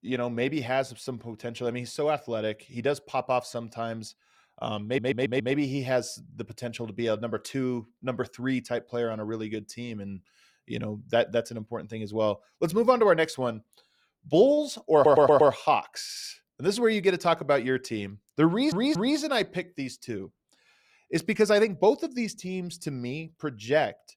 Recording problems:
audio stuttering; 4 times, first at 5 s

